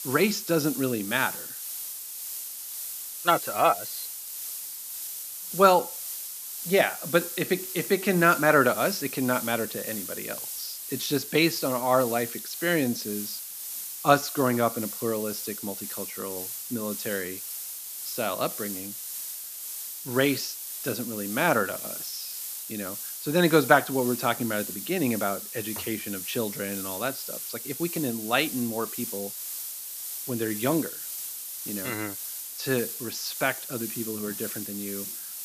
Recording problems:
high frequencies cut off; slight; nothing above 8 kHz
hiss; loud; throughout; 7 dB below the speech

